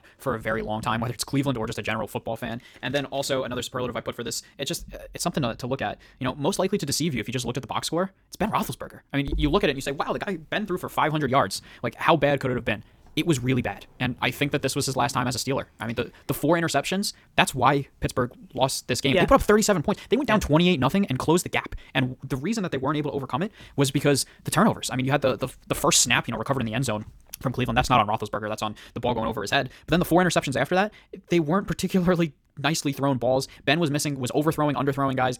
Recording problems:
wrong speed, natural pitch; too fast; 1.5 times normal speed

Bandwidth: 18.5 kHz